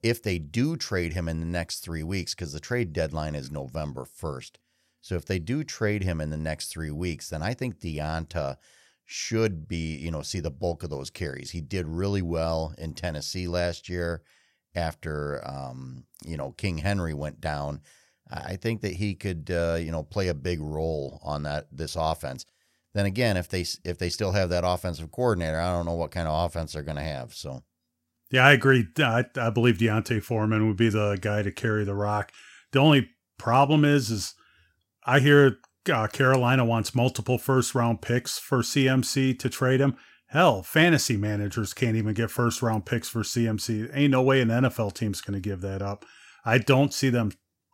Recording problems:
none

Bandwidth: 16 kHz